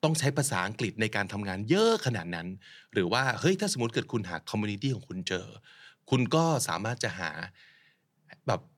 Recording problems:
none

